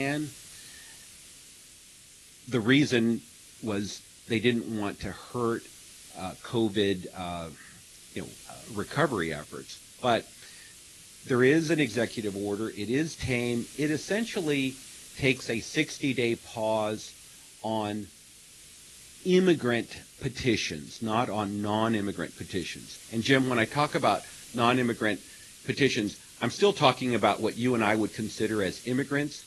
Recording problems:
garbled, watery; slightly; nothing above 11 kHz
hiss; noticeable; throughout; 20 dB below the speech
abrupt cut into speech; at the start

